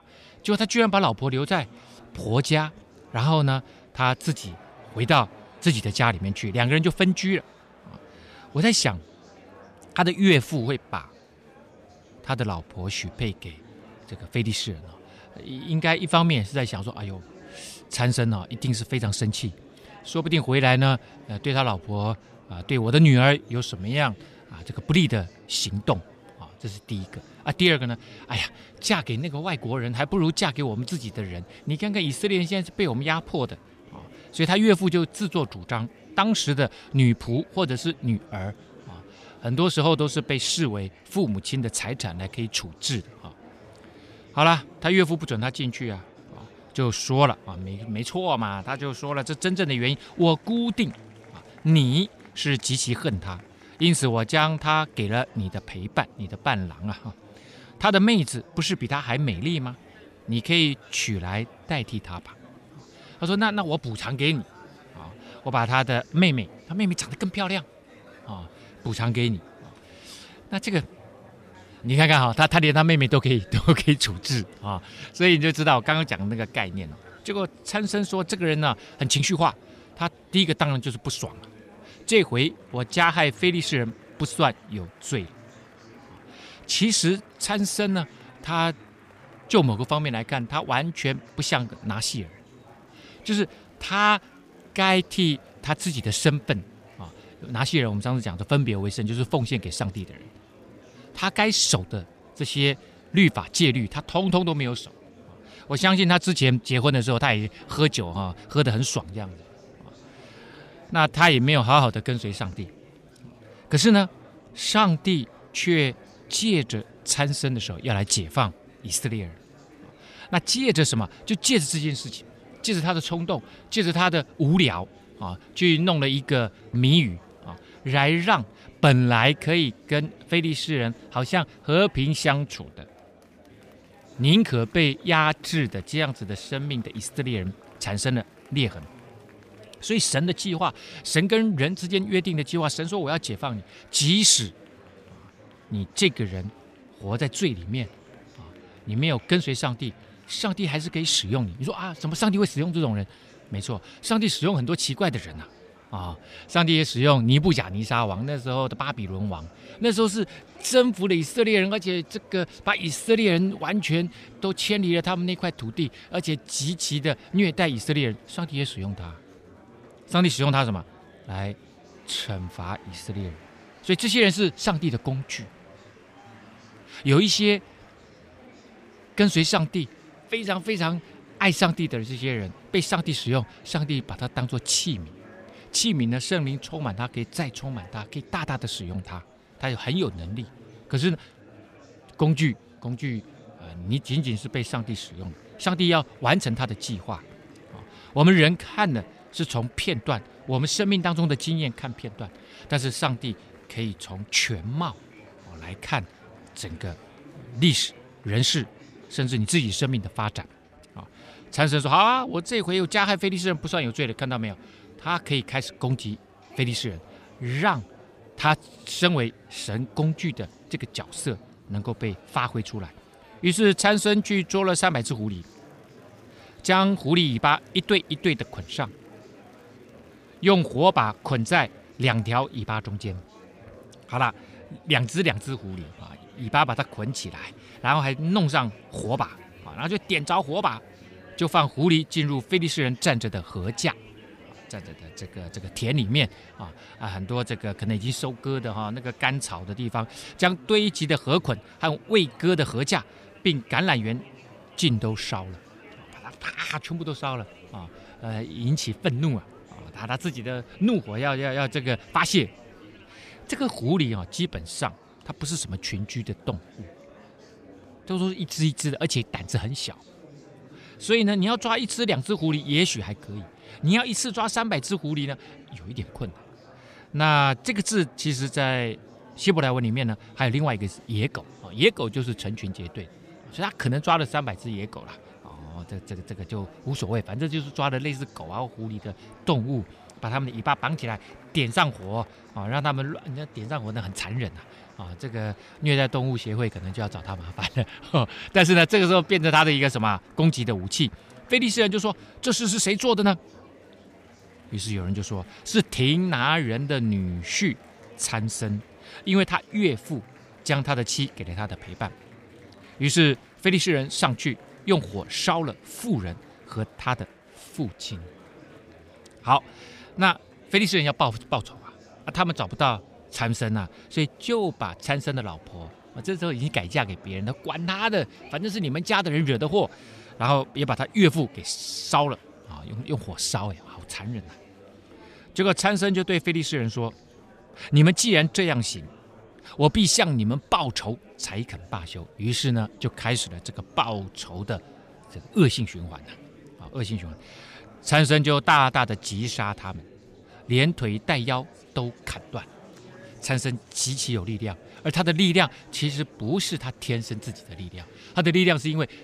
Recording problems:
murmuring crowd; faint; throughout; 25 dB below the speech

